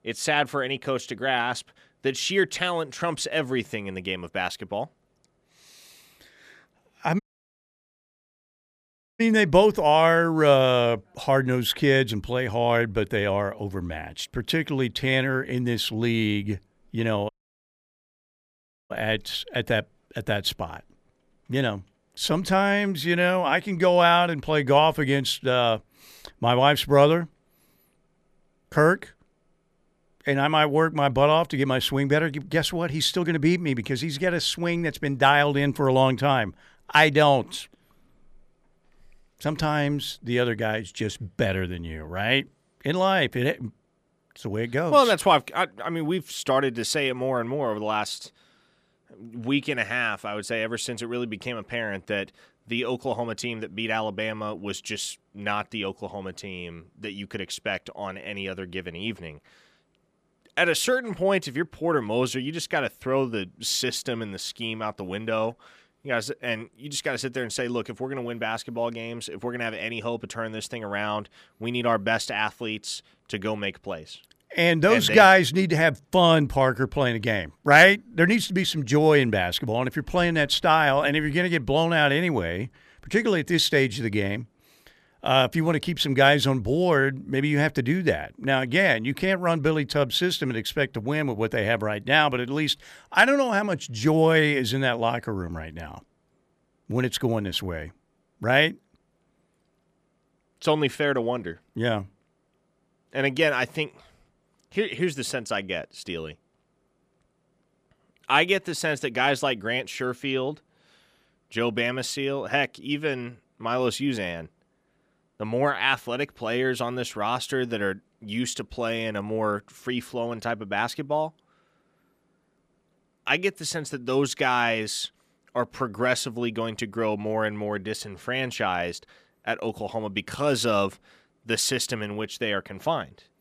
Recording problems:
audio cutting out; at 7 s for 2 s and at 17 s for 1.5 s

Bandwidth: 14.5 kHz